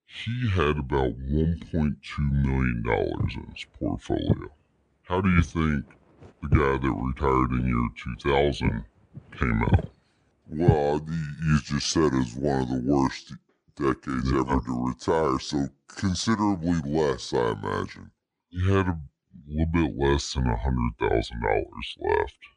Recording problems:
wrong speed and pitch; too slow and too low; 0.7 times normal speed
footsteps; loud; from 3 to 11 s; peak 1 dB above the speech

